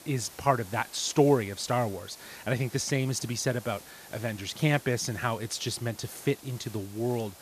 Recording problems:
hiss; noticeable; throughout; 20 dB below the speech

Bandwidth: 14.5 kHz